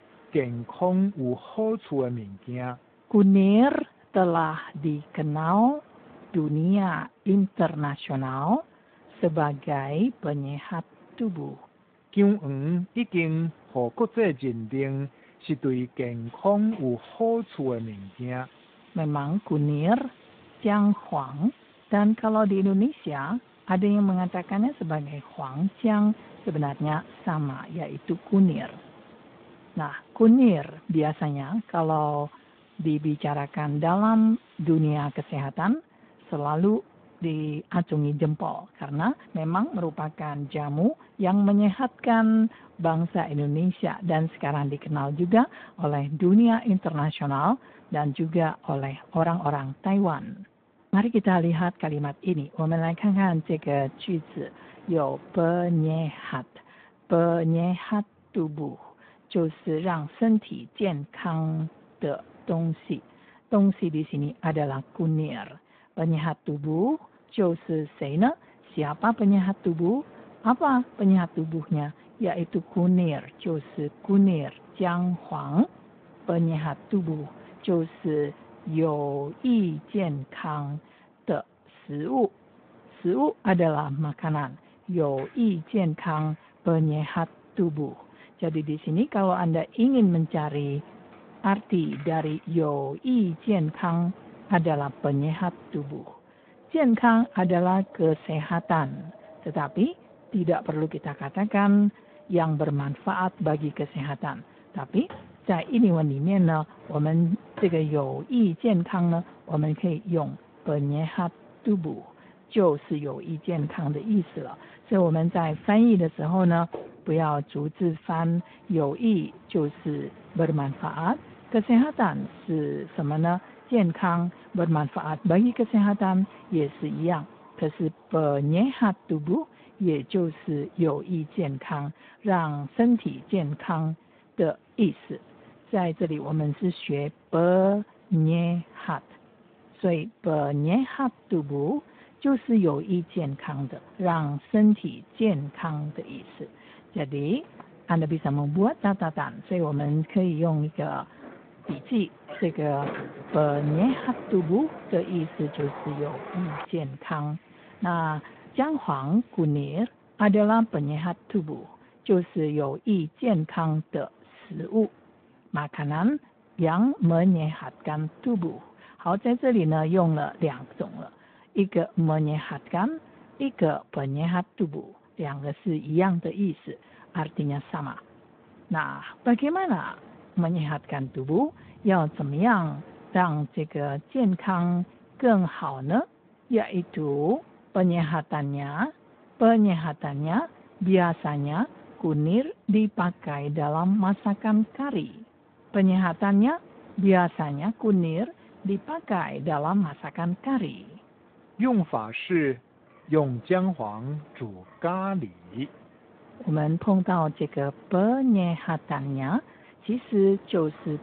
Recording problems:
phone-call audio; nothing above 3.5 kHz
wind in the background; faint; throughout; 25 dB below the speech
door banging; noticeable; from 2:27 to 2:37; peak 9 dB below the speech

